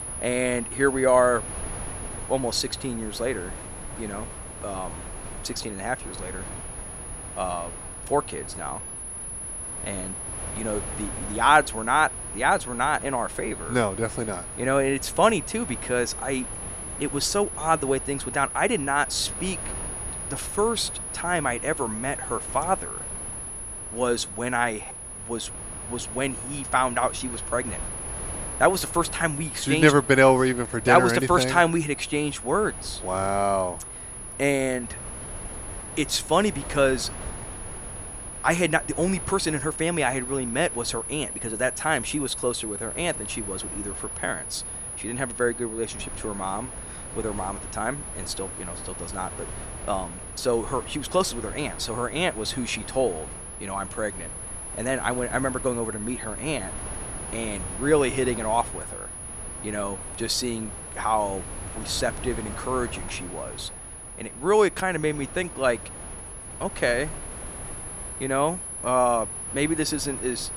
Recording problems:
high-pitched whine; loud; throughout; 10.5 kHz, 9 dB below the speech
wind noise on the microphone; occasional gusts; 20 dB below the speech

